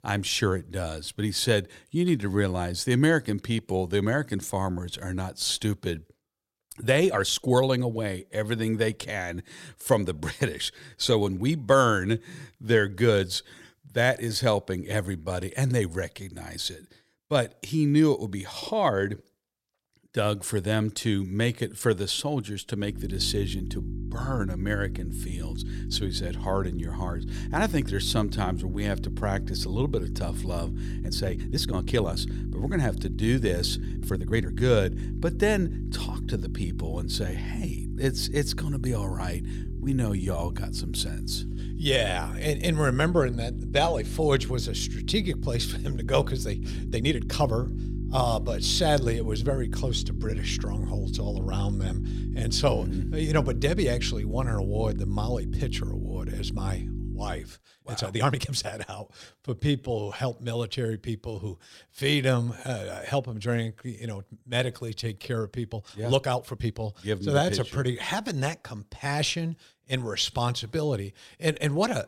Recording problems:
electrical hum; noticeable; from 23 to 57 s; 50 Hz, 15 dB below the speech
uneven, jittery; strongly; from 6.5 s to 1:07

